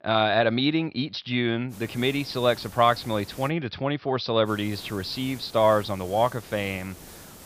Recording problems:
high frequencies cut off; noticeable; nothing above 5.5 kHz
hiss; noticeable; from 1.5 to 3.5 s and from 4.5 s on; 20 dB below the speech

